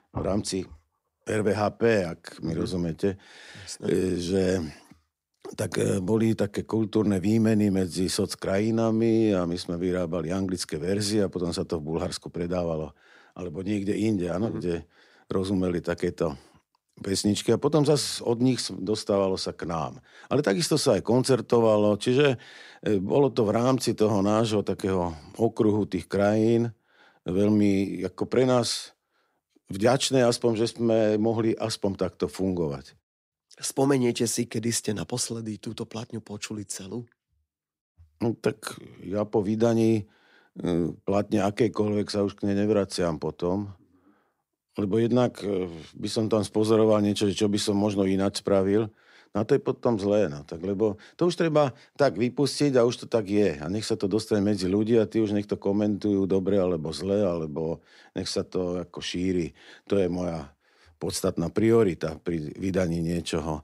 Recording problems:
none

